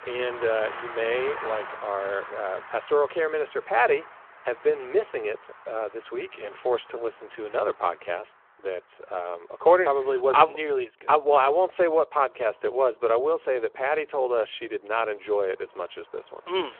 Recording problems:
phone-call audio
traffic noise; noticeable; throughout; 15 dB below the speech

